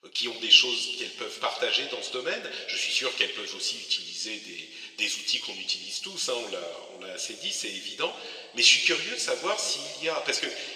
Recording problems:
thin; very; fading below 500 Hz
room echo; slight; dies away in 1.8 s
off-mic speech; somewhat distant

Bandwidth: 14.5 kHz